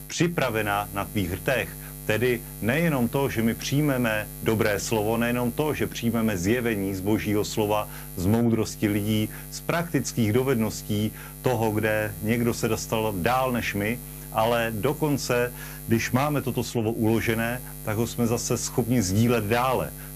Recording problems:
electrical hum; noticeable; throughout; 50 Hz, 20 dB below the speech

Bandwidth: 15 kHz